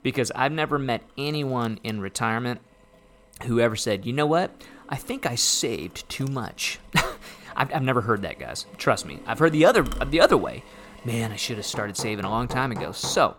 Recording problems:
machinery noise; noticeable; throughout; 20 dB below the speech

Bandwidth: 17.5 kHz